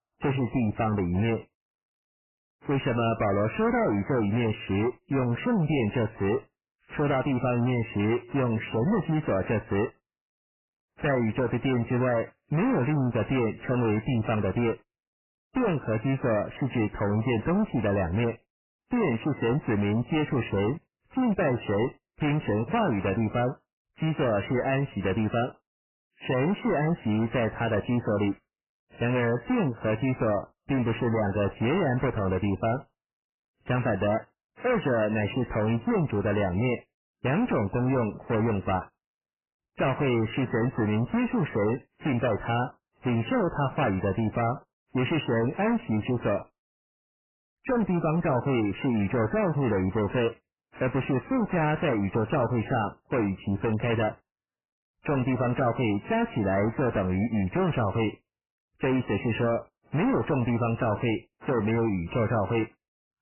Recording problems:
distortion; heavy; 22% of the sound clipped
garbled, watery; badly; nothing above 3 kHz

